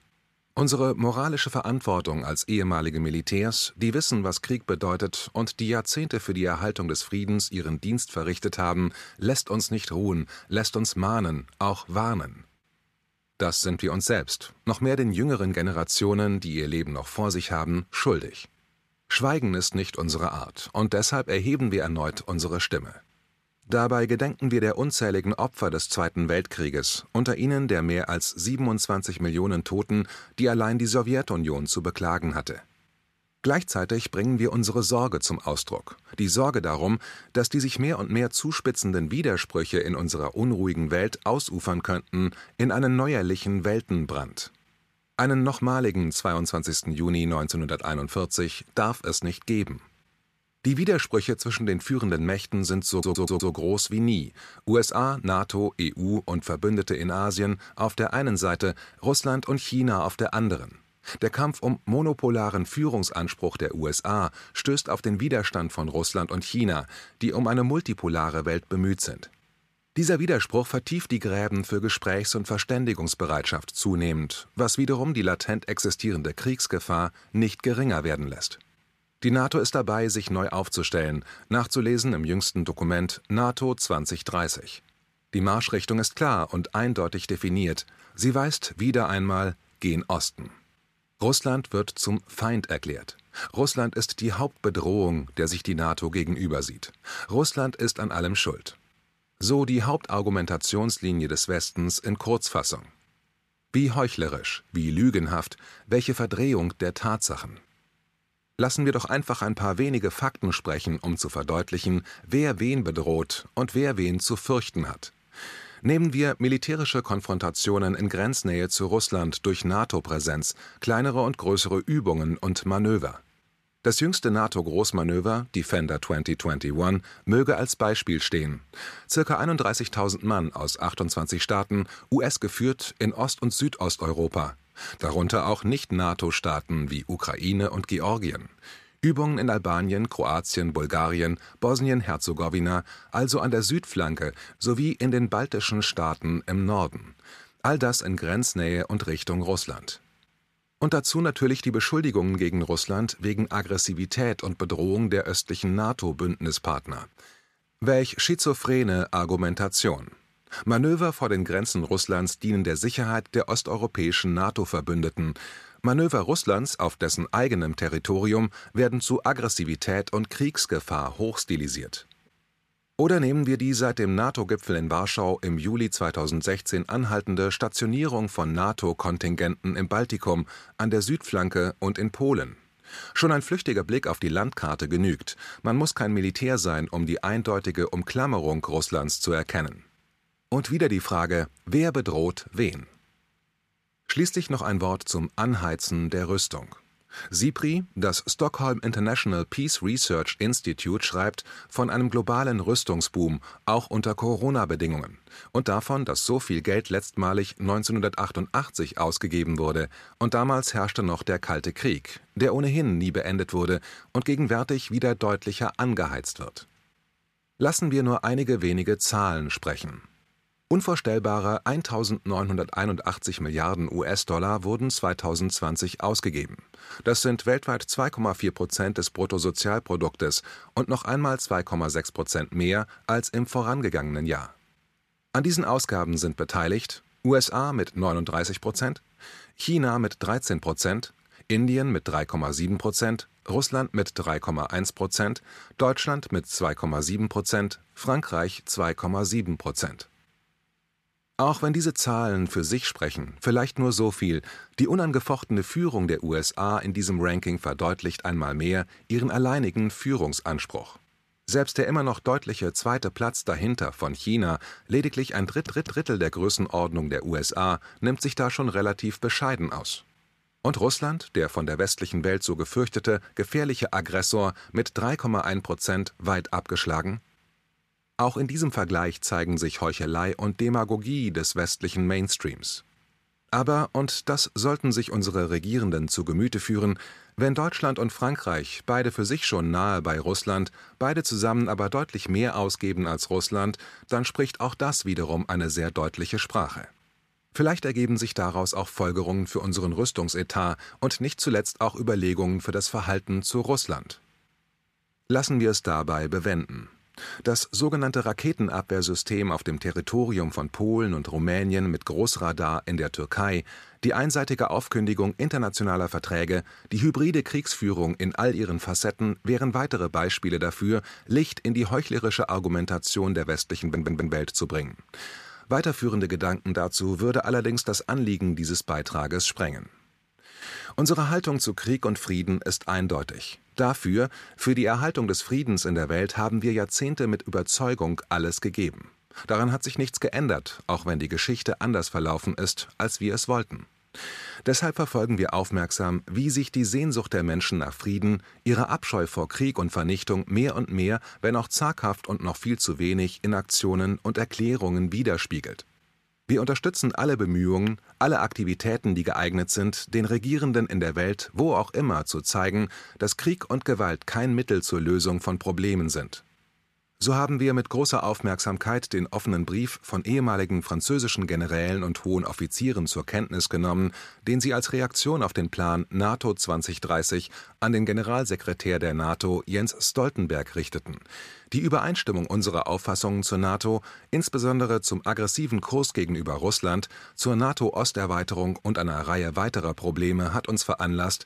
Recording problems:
audio stuttering; at 53 s, at 4:25 and at 5:24

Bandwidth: 14.5 kHz